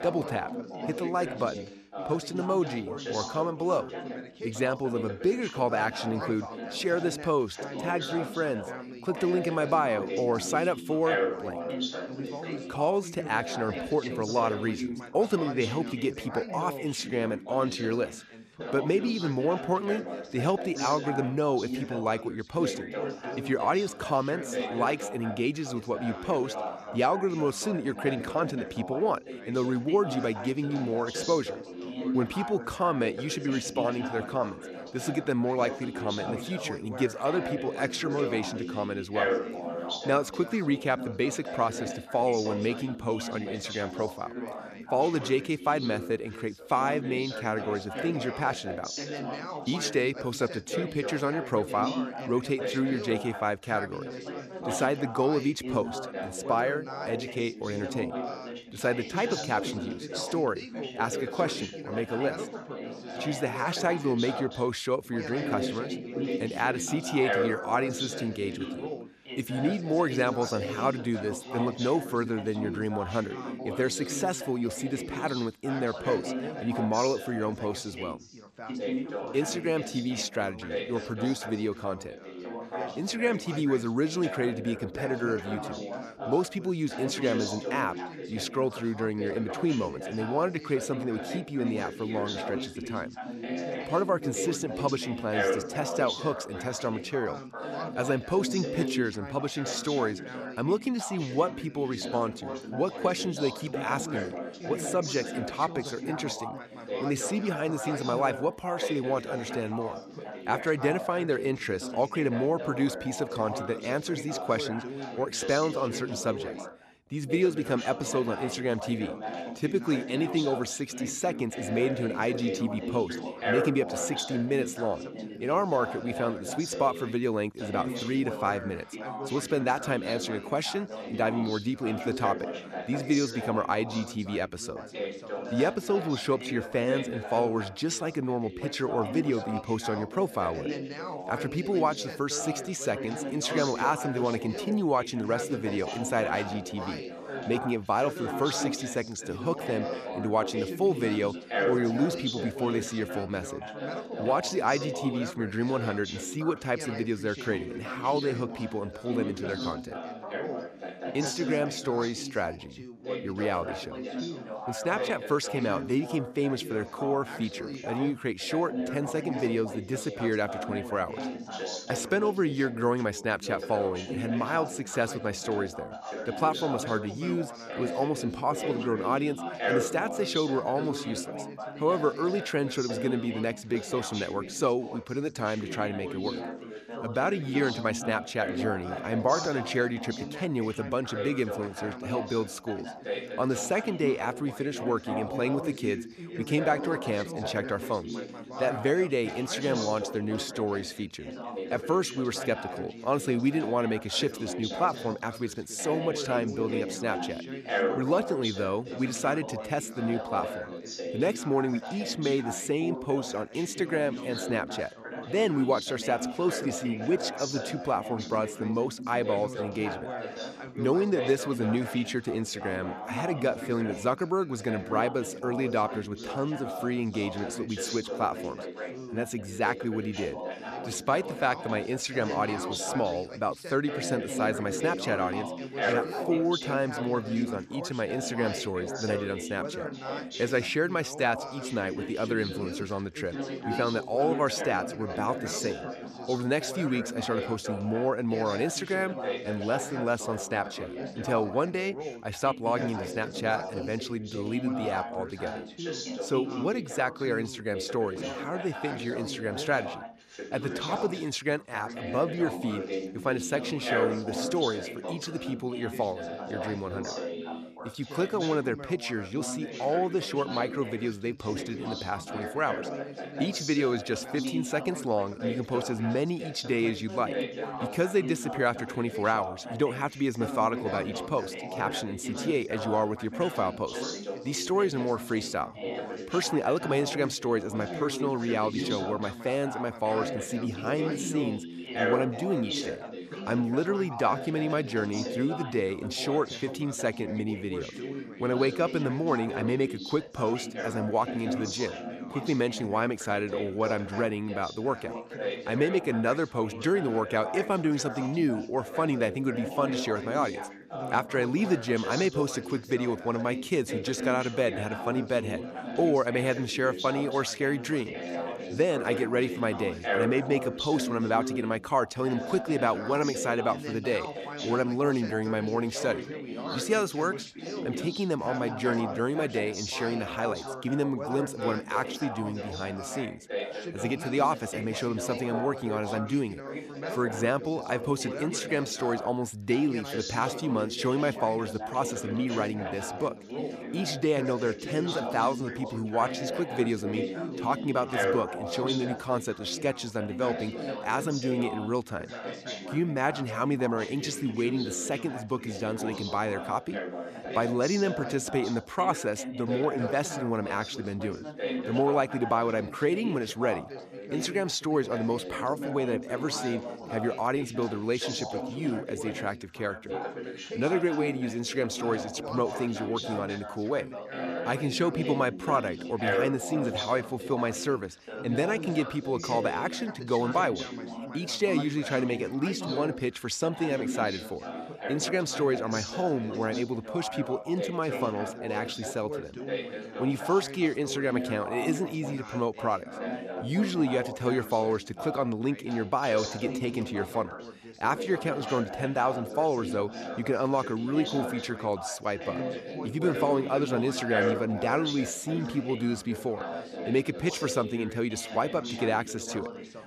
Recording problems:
background chatter; loud; throughout; 3 voices, 6 dB below the speech

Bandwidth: 14.5 kHz